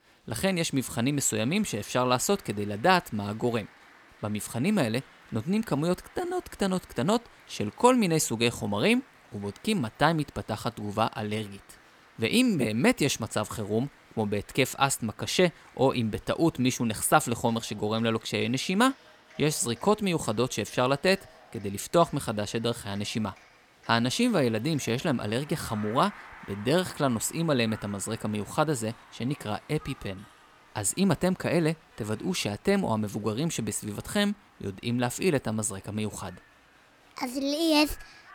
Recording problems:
crowd noise; faint; throughout; 25 dB below the speech

